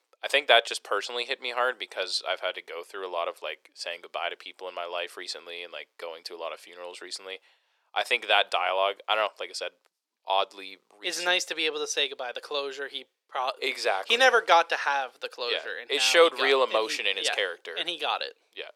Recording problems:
thin; very; fading below 400 Hz

